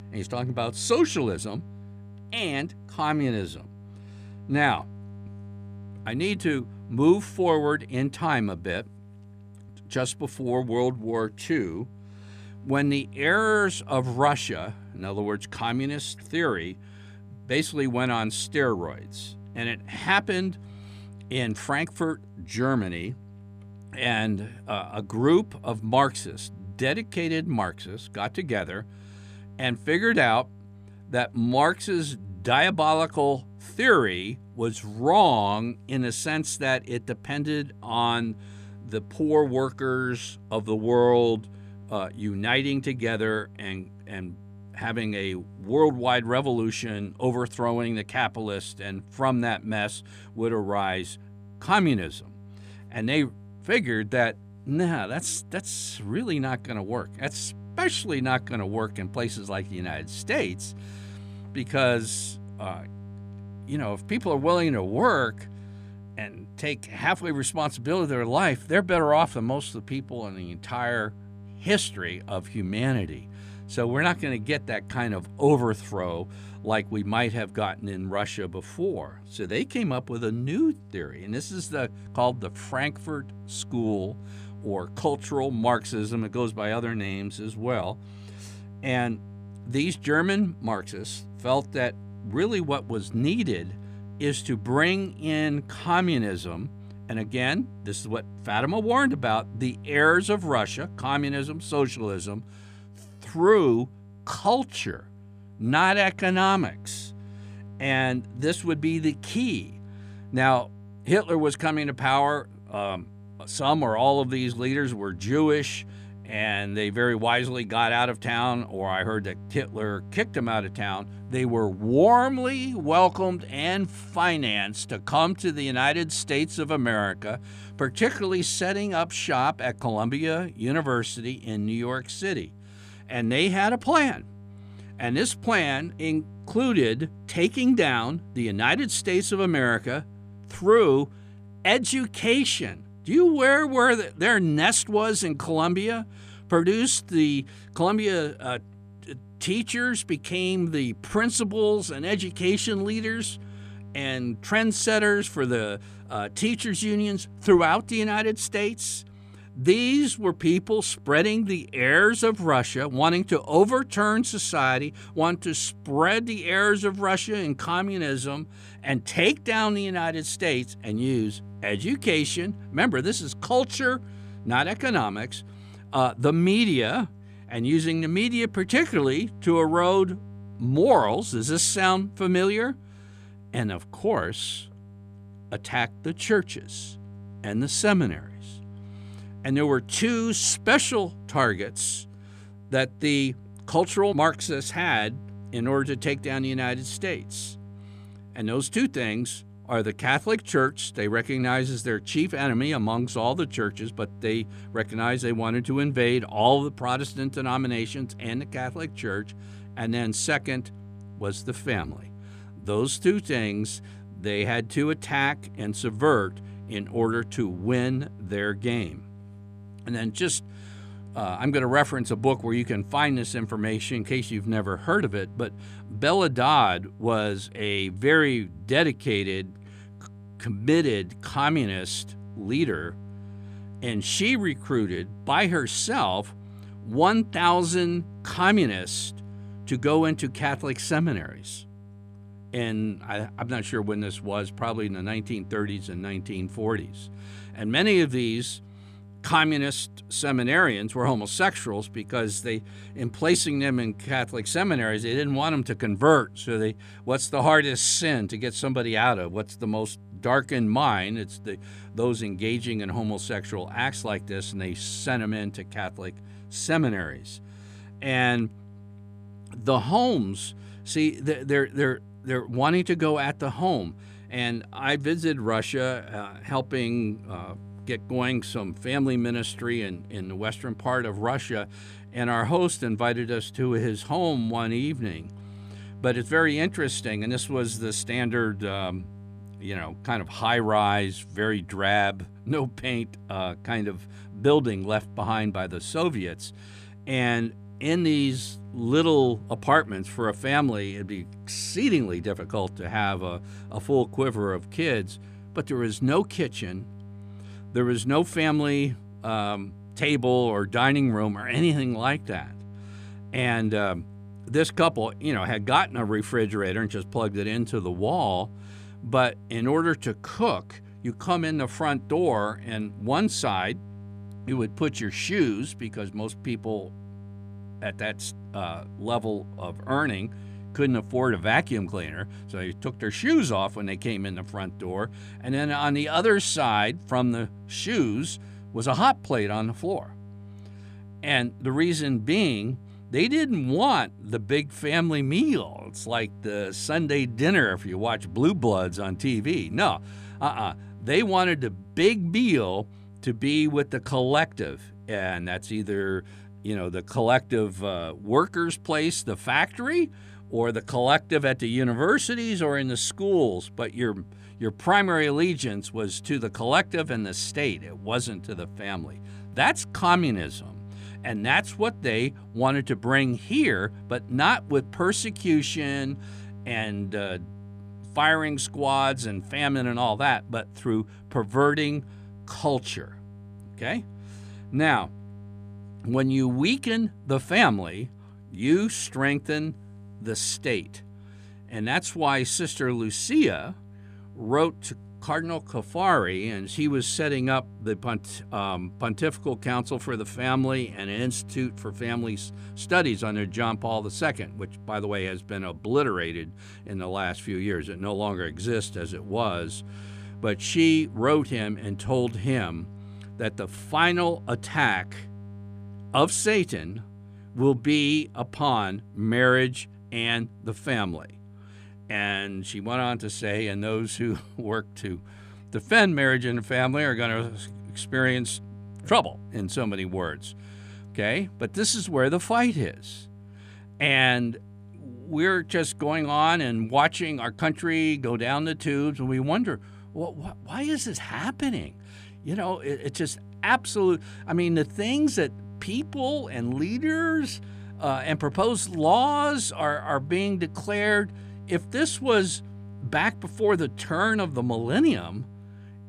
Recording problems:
electrical hum; faint; throughout; 50 Hz, 30 dB below the speech

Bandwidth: 14.5 kHz